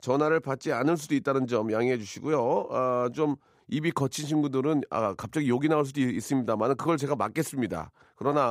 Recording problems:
abrupt cut into speech; at the end

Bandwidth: 15.5 kHz